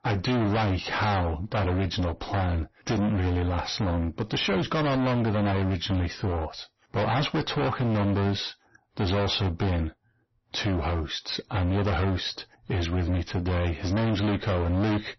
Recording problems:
distortion; heavy; 31% of the sound clipped
garbled, watery; slightly; nothing above 6 kHz

